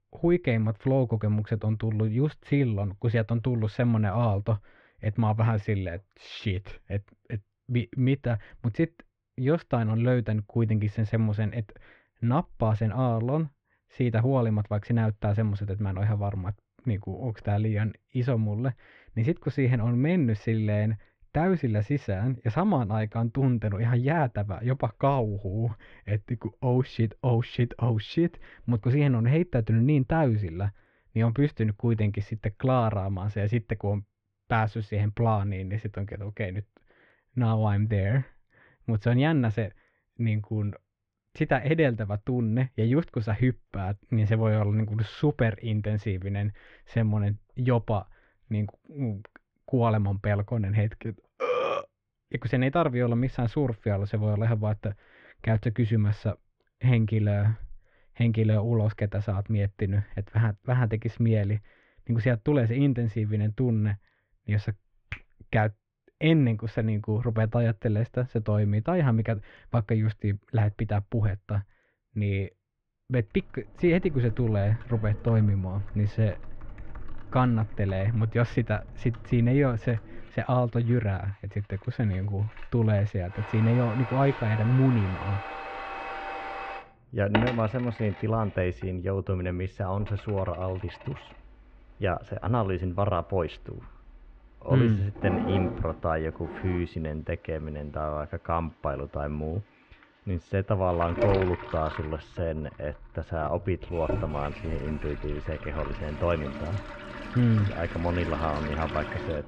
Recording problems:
muffled; very; fading above 2.5 kHz
household noises; noticeable; from 1:14 on; 10 dB below the speech

